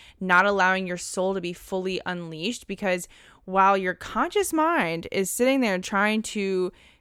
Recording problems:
none

